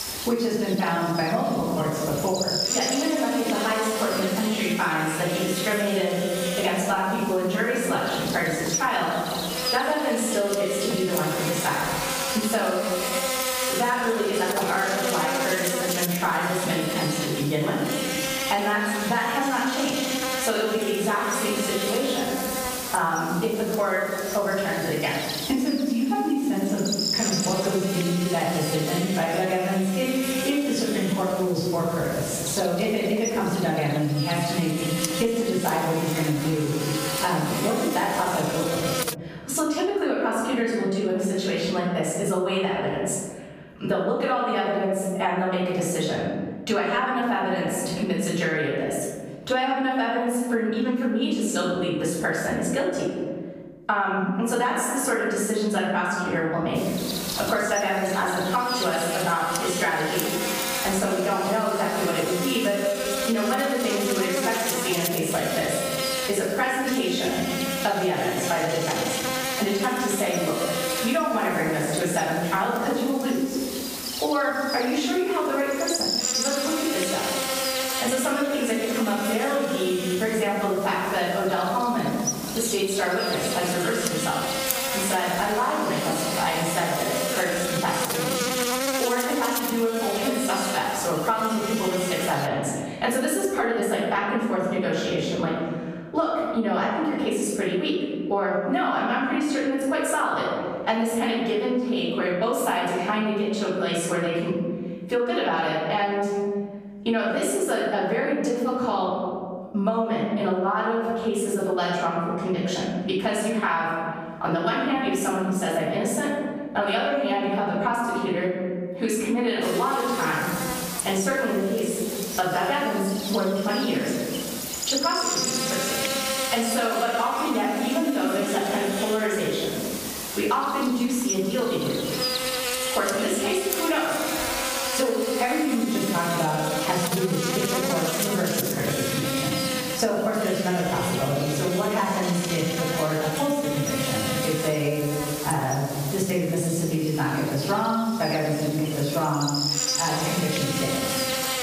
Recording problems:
off-mic speech; far
room echo; noticeable; dies away in 1.1 s
squashed, flat; somewhat
electrical hum; loud; until 39 s, from 57 s to 1:32 and from 2:00 on; 60 Hz, 4 dB below the speech

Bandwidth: 15 kHz